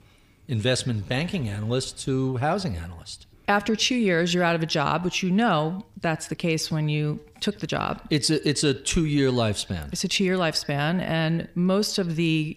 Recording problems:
echo of what is said; faint; throughout; 90 ms later, 20 dB below the speech

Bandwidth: 15 kHz